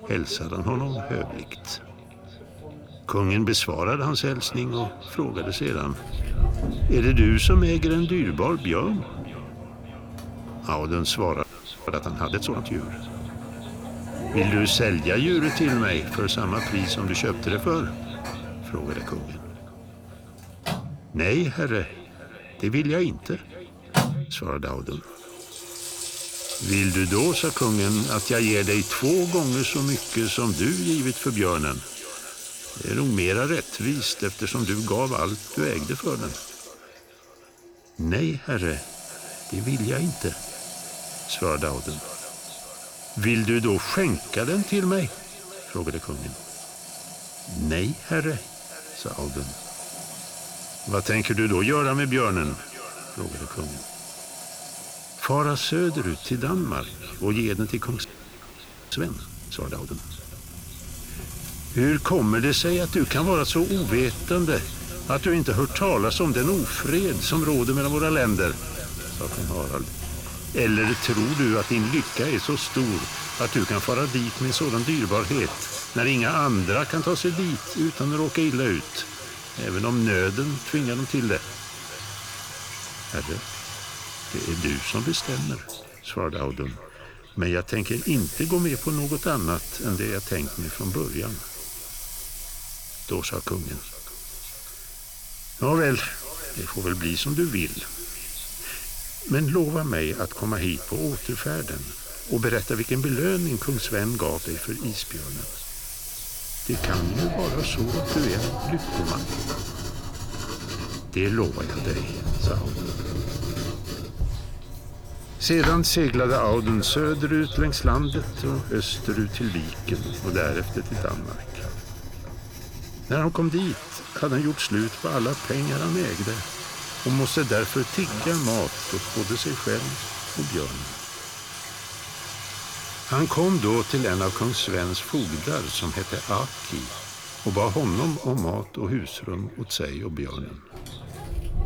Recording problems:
echo of what is said; faint; throughout; 600 ms later, 20 dB below the speech
household noises; loud; throughout; 7 dB below the speech
audio freezing; at 11 s and at 58 s for 1 s

